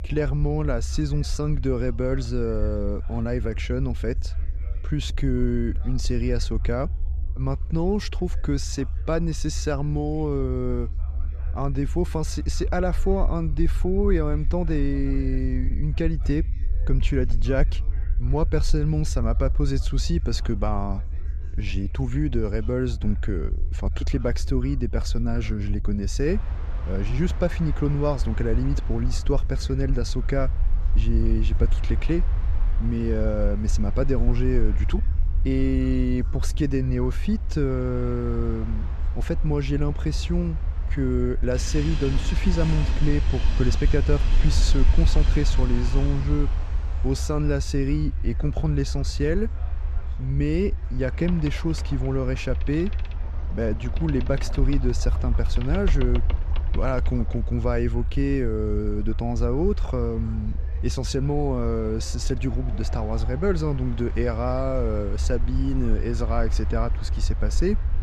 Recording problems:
train or aircraft noise; noticeable; from 26 s on; 15 dB below the speech
low rumble; noticeable; throughout; 20 dB below the speech
background chatter; faint; throughout; 4 voices, 30 dB below the speech

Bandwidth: 14.5 kHz